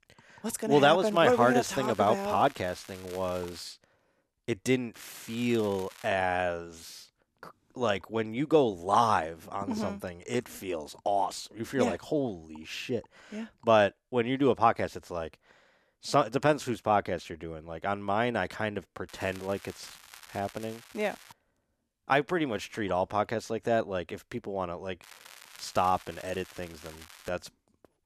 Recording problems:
crackling; faint; 4 times, first at 1 s; 20 dB below the speech

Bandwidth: 14 kHz